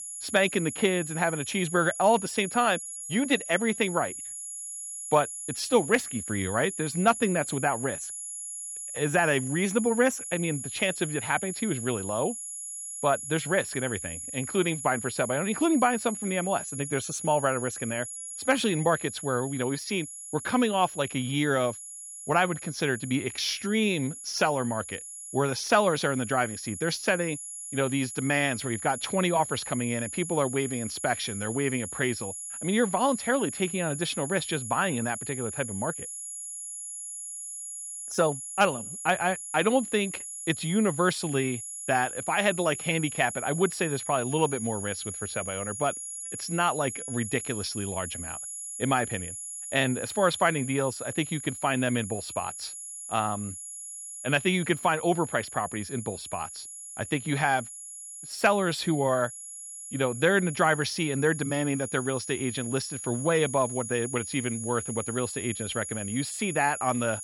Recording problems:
high-pitched whine; loud; throughout; 11 kHz, 8 dB below the speech

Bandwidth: 16 kHz